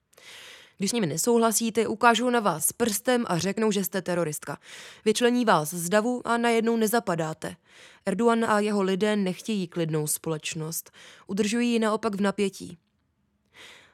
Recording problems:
uneven, jittery; strongly; from 0.5 to 13 s

